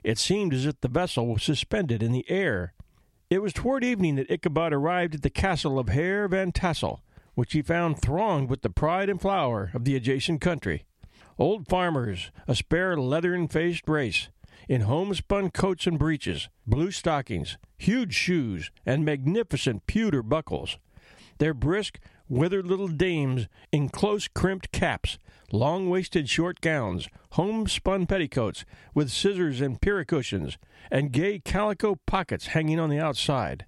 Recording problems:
squashed, flat; somewhat

